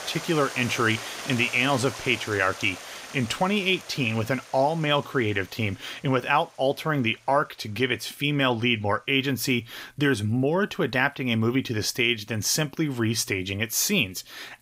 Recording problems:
rain or running water; noticeable; throughout; 15 dB below the speech

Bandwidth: 15.5 kHz